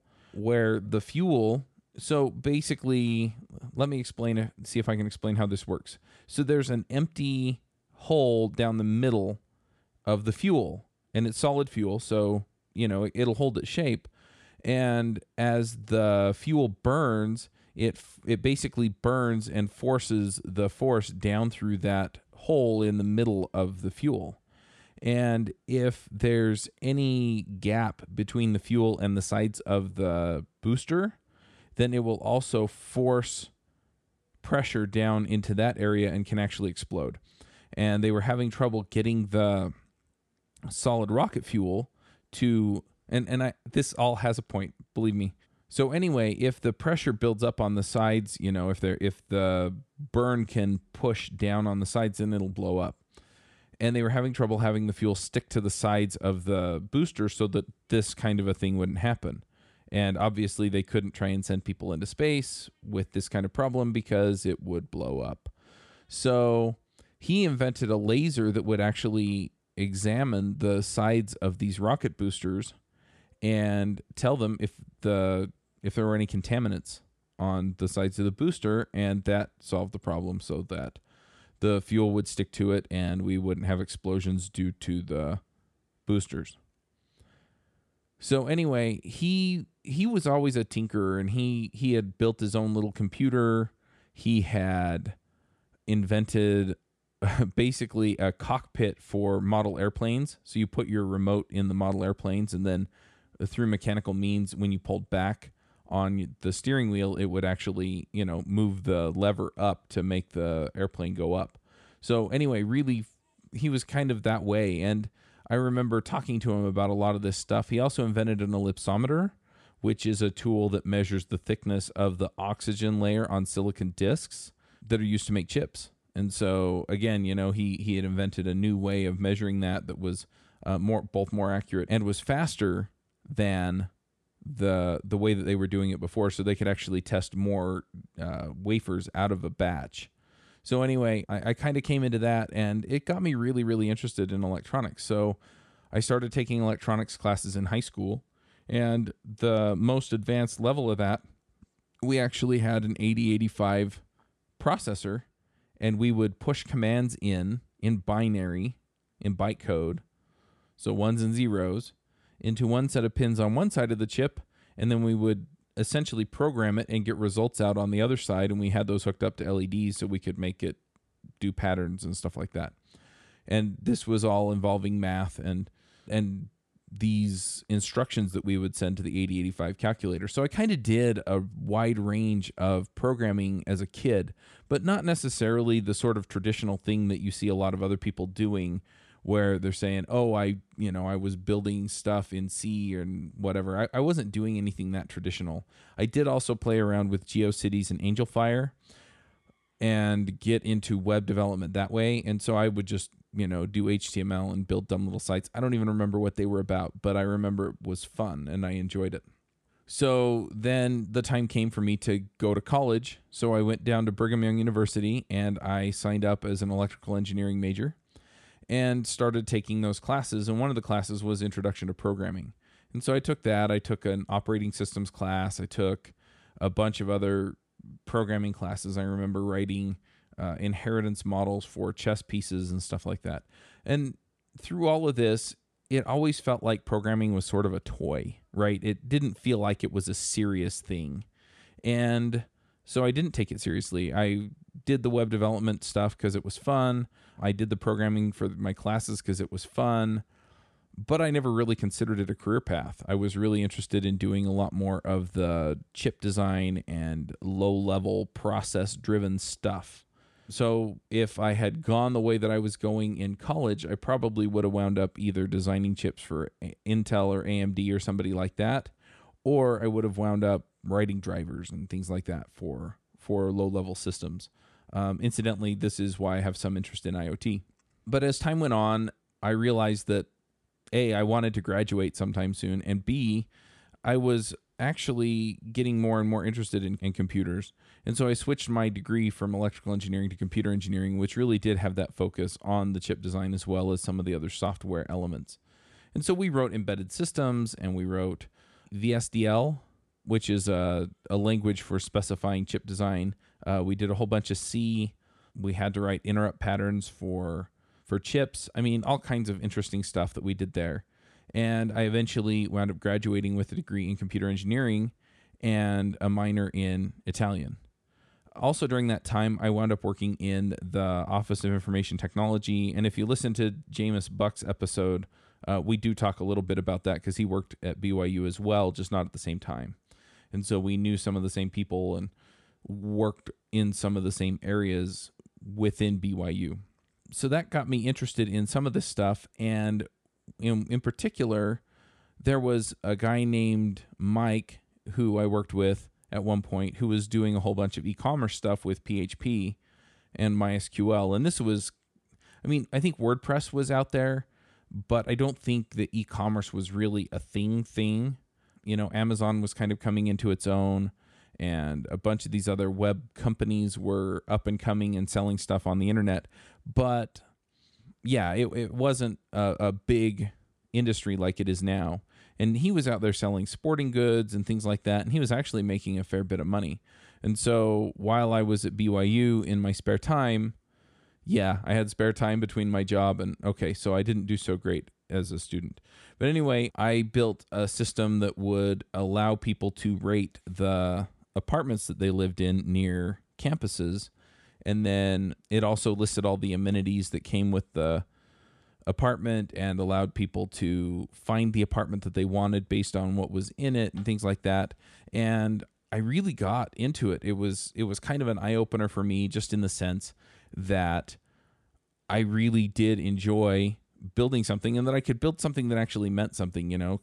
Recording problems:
none

